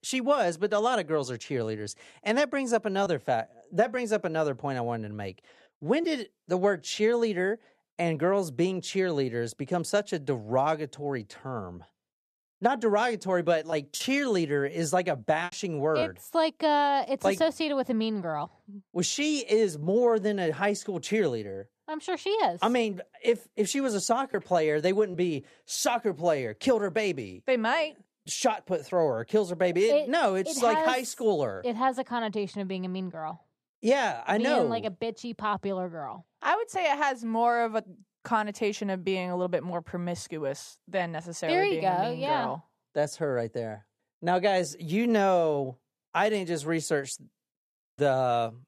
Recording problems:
choppy; occasionally; from 14 to 16 s; 2% of the speech affected

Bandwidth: 14.5 kHz